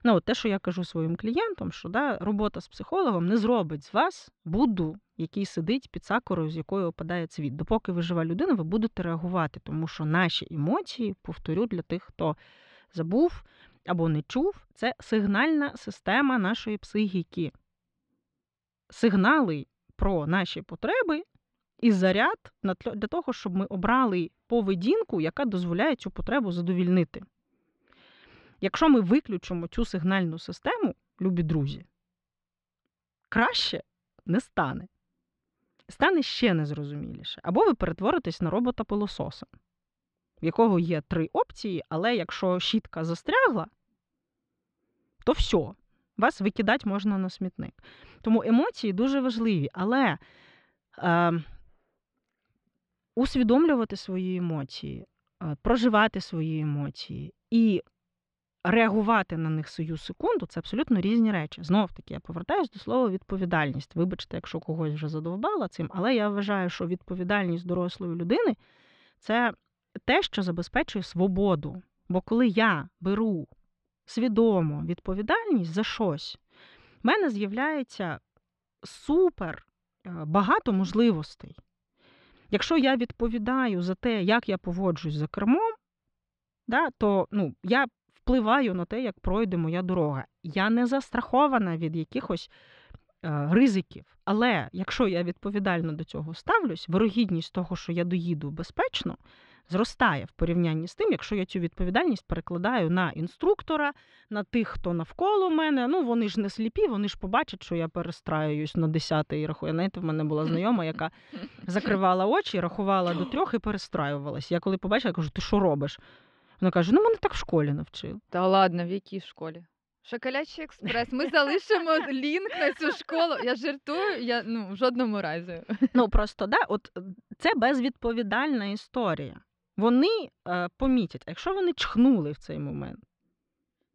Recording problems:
muffled; slightly; fading above 3.5 kHz

